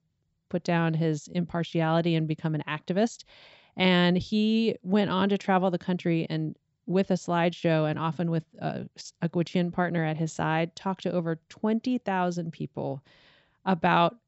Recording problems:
high frequencies cut off; noticeable; nothing above 7.5 kHz

